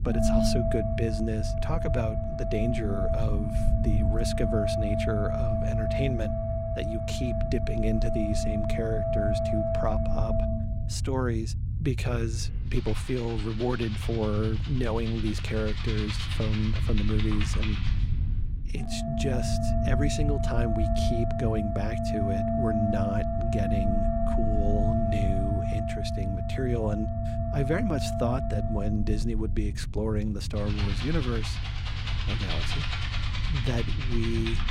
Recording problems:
background music; loud; throughout; 1 dB below the speech
low rumble; noticeable; throughout; 10 dB below the speech

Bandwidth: 16.5 kHz